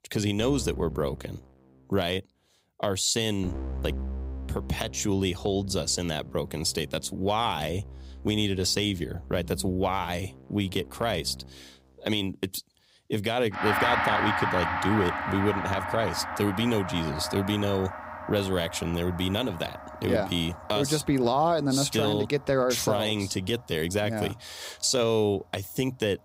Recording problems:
background music; loud; throughout; 6 dB below the speech

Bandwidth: 15.5 kHz